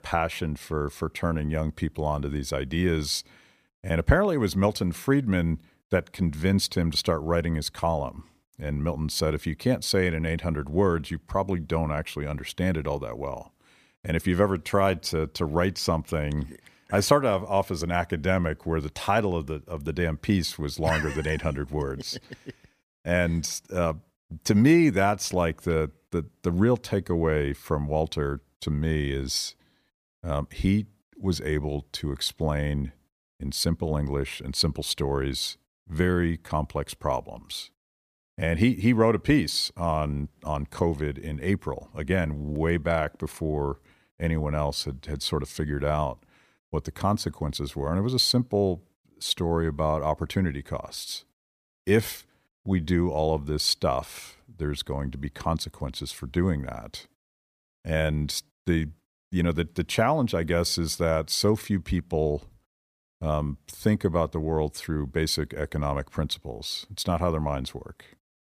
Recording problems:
none

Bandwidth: 15 kHz